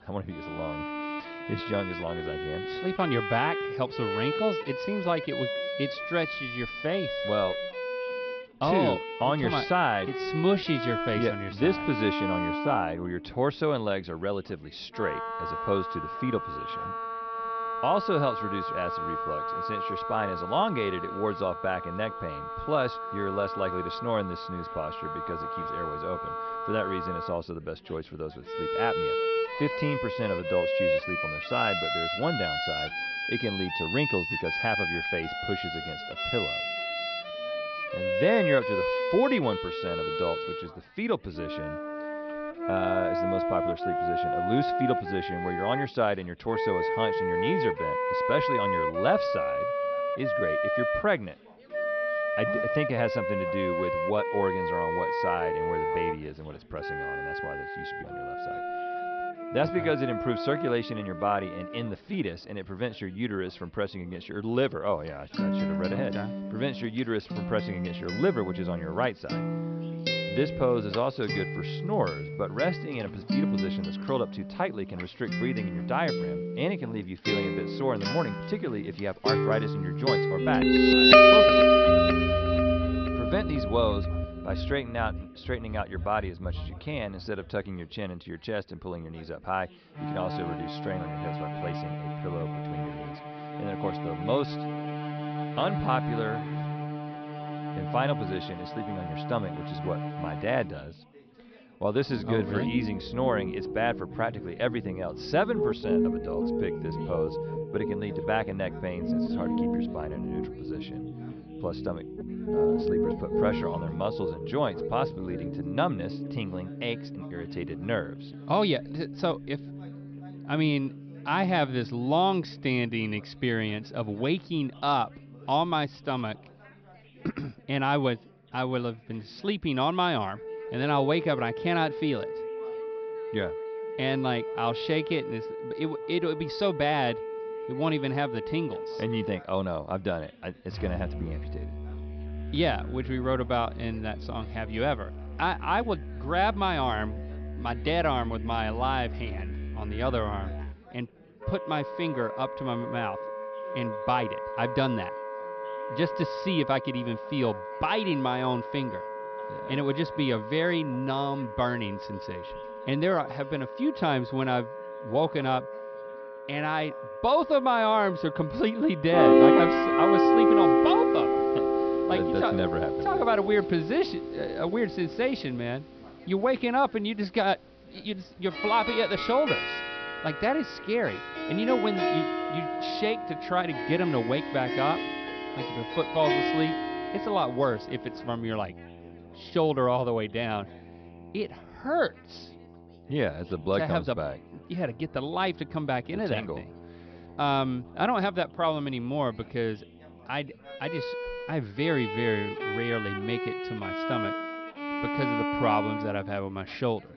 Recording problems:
high frequencies cut off; noticeable; nothing above 5.5 kHz
background music; very loud; throughout; as loud as the speech
background chatter; faint; throughout; 3 voices, 25 dB below the speech

